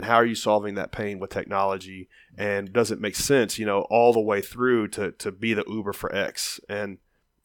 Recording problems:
abrupt cut into speech; at the start

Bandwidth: 17.5 kHz